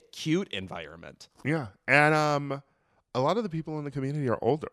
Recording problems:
none

